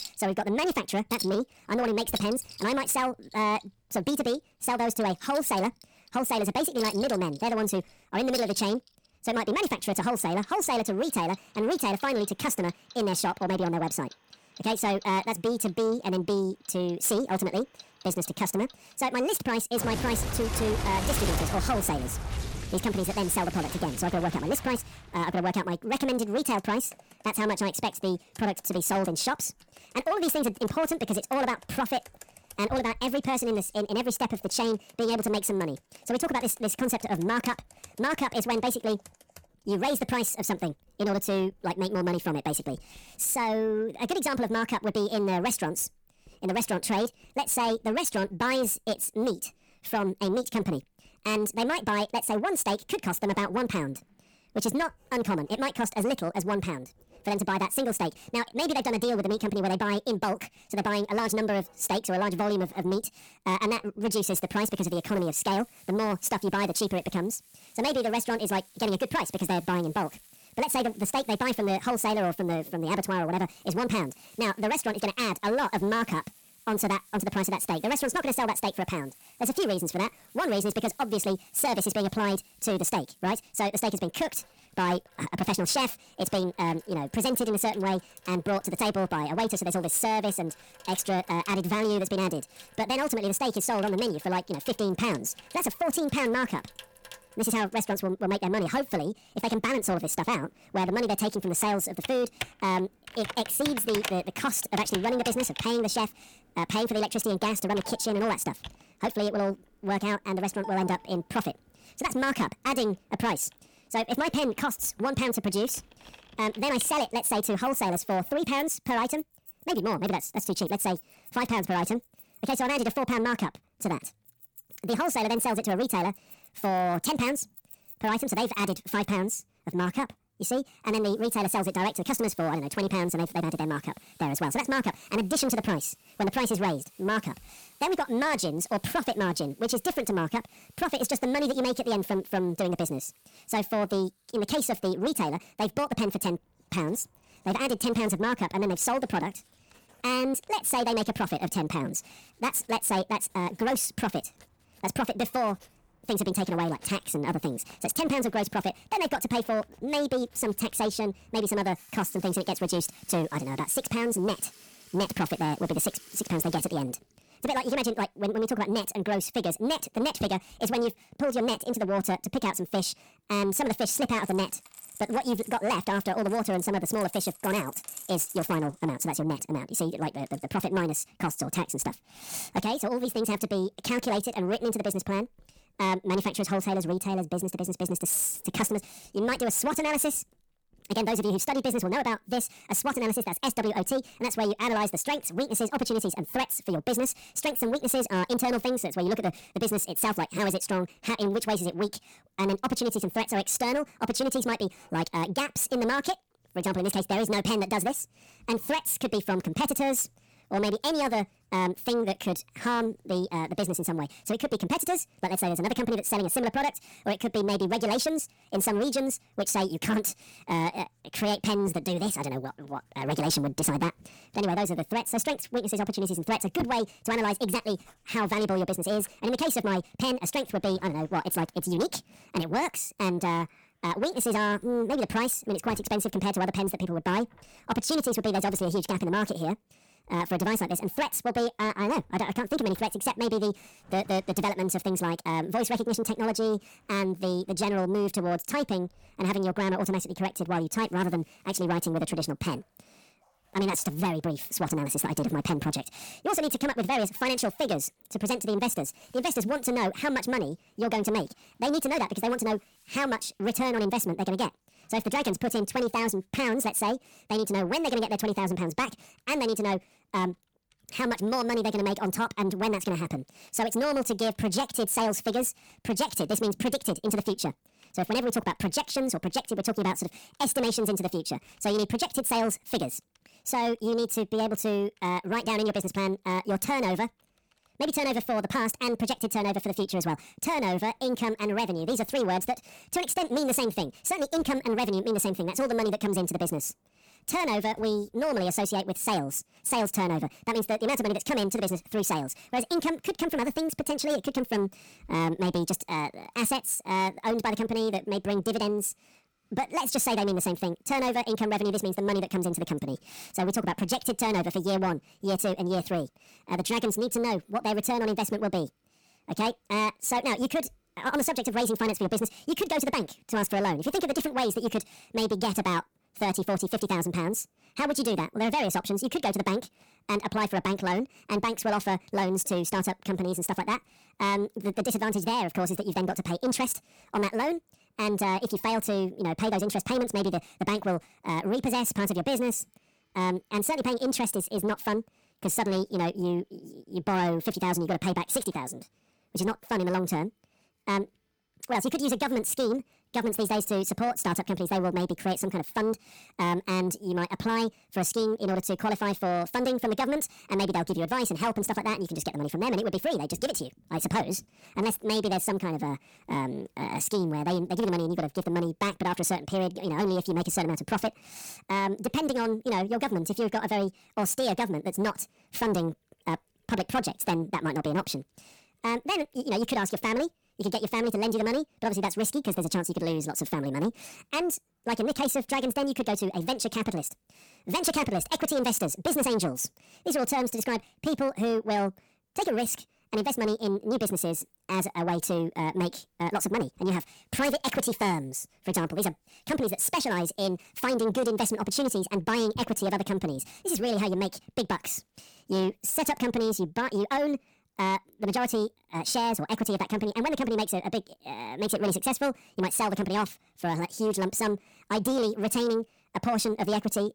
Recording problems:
wrong speed and pitch; too fast and too high; 1.6 times normal speed
distortion; slight; 10 dB below the speech
household noises; noticeable; throughout; 15 dB below the speech

